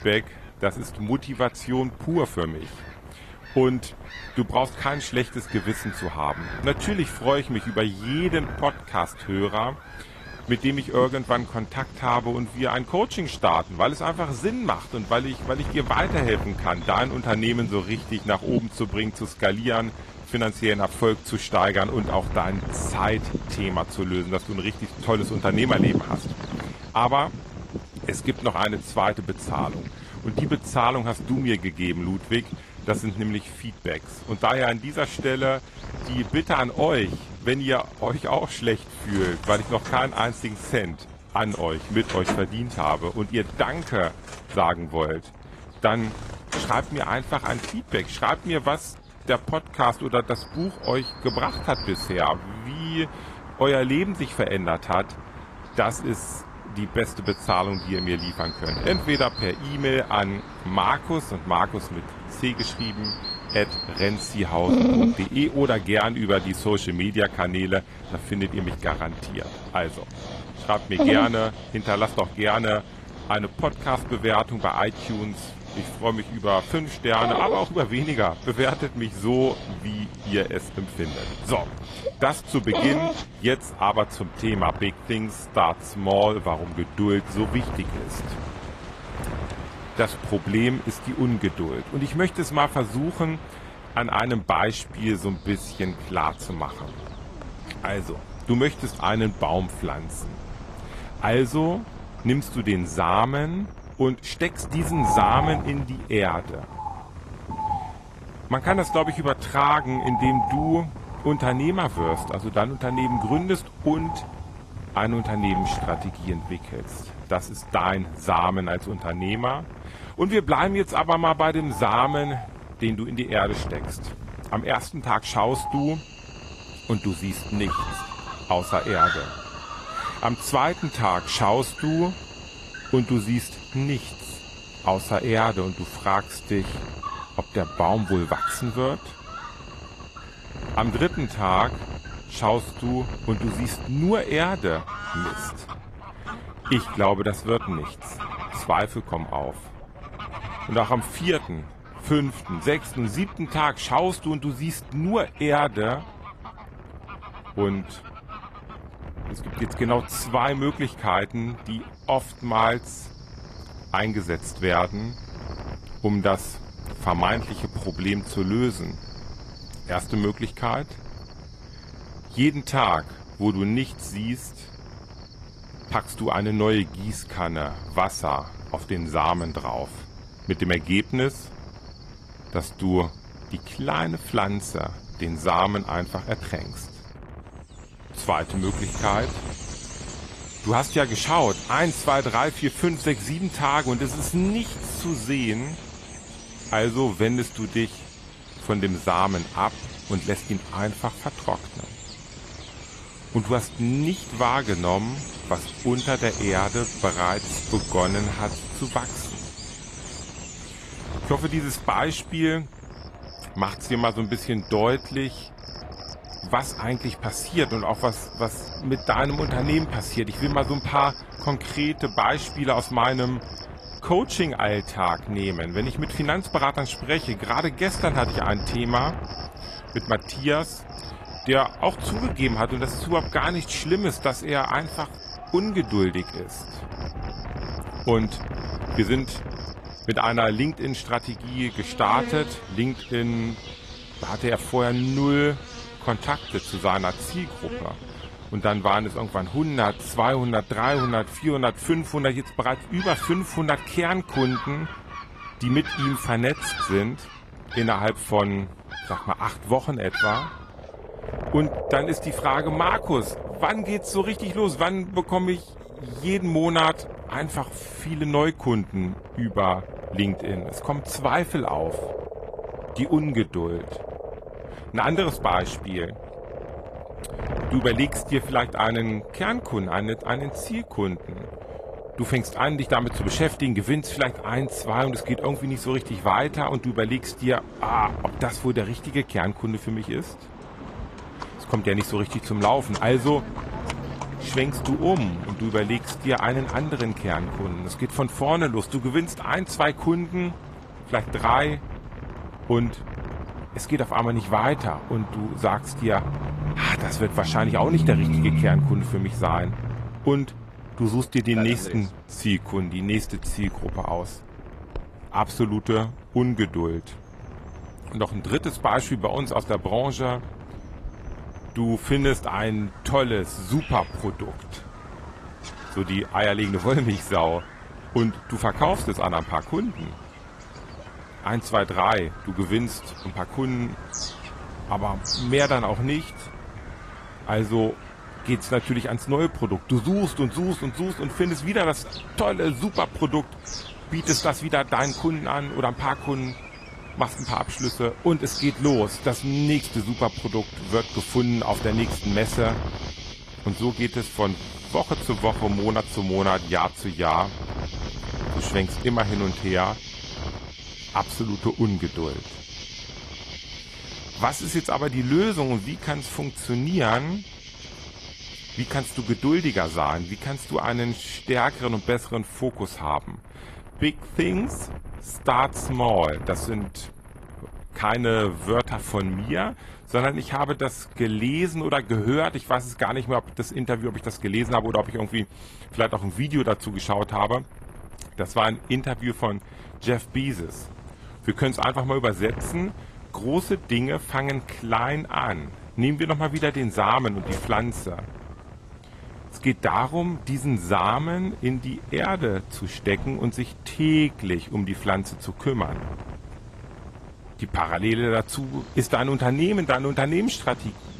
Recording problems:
garbled, watery; slightly; nothing above 14.5 kHz
animal sounds; noticeable; throughout; 10 dB below the speech
wind noise on the microphone; occasional gusts; 20 dB below the speech

